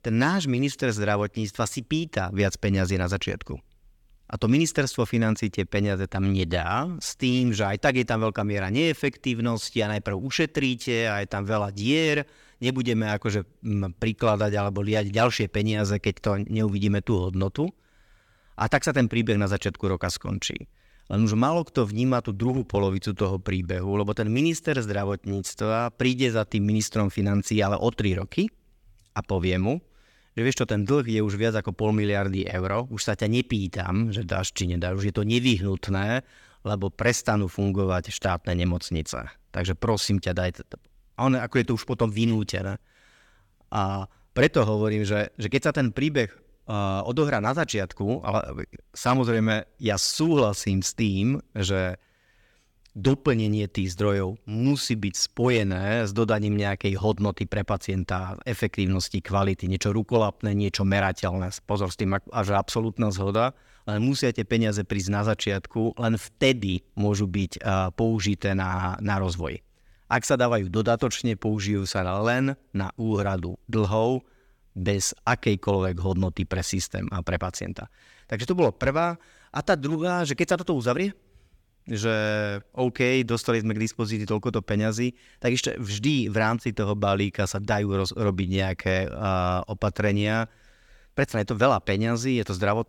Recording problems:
none

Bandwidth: 17.5 kHz